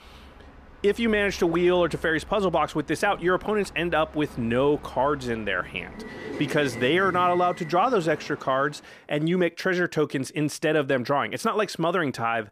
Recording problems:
train or aircraft noise; noticeable; until 8.5 s; 15 dB below the speech

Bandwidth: 14.5 kHz